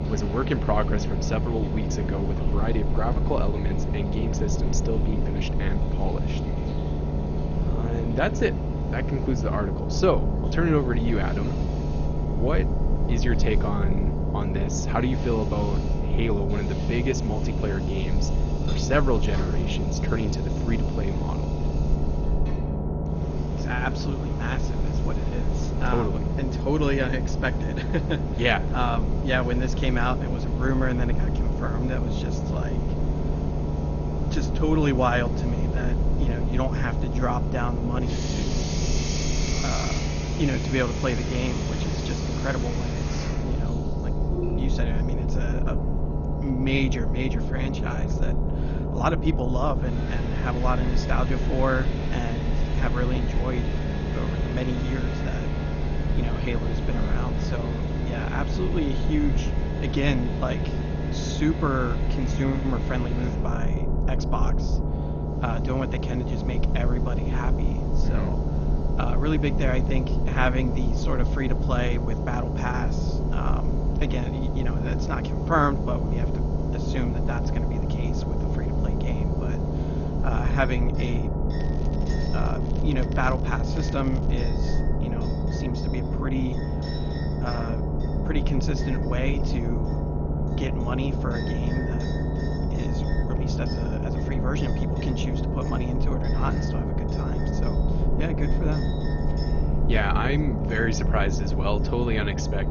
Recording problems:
garbled, watery; slightly; nothing above 6.5 kHz
low rumble; loud; throughout; 4 dB below the speech
household noises; noticeable; throughout; 15 dB below the speech
crackling; faint; from 1:22 to 1:24; 25 dB below the speech

